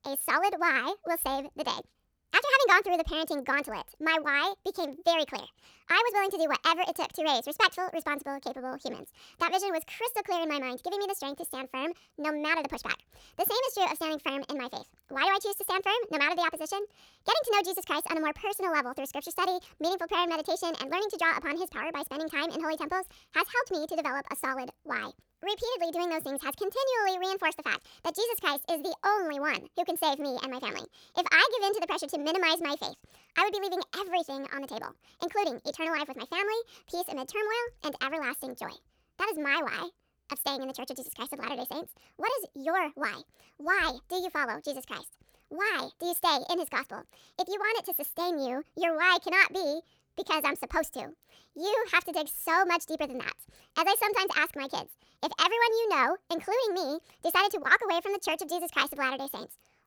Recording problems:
wrong speed and pitch; too fast and too high; 1.5 times normal speed

